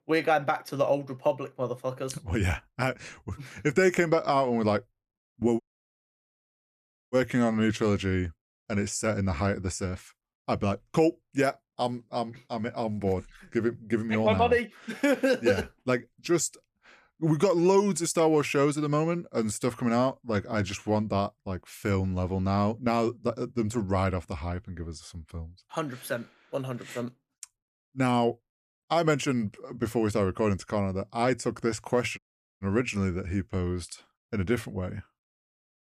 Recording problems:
audio cutting out; at 5.5 s for 1.5 s and at 32 s

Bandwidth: 15 kHz